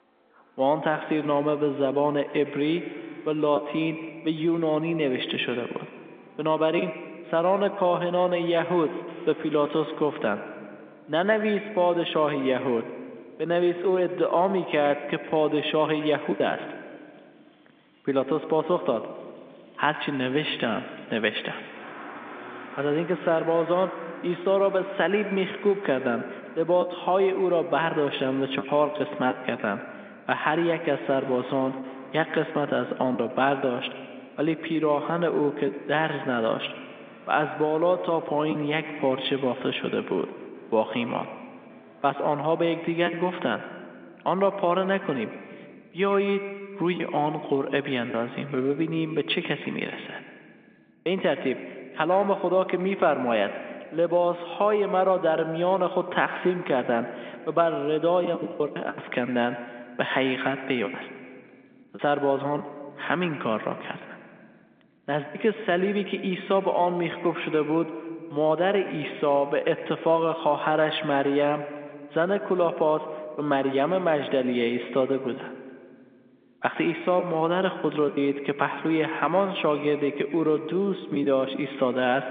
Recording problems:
echo of what is said; strong; throughout; 110 ms later, 10 dB below the speech
phone-call audio
traffic noise; faint; until 42 s; 25 dB below the speech
choppy; occasionally; 3% of the speech affected

